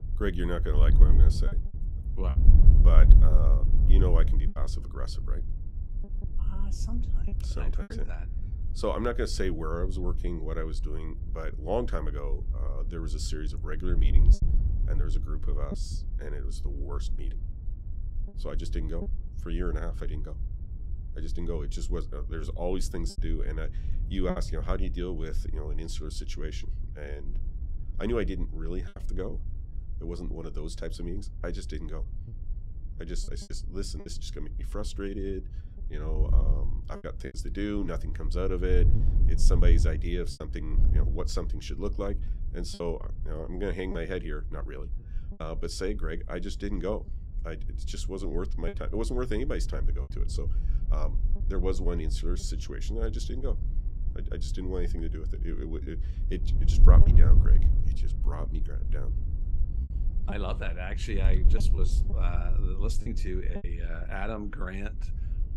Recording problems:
wind noise on the microphone; occasional gusts; 10 dB below the speech
choppy; occasionally; 3% of the speech affected

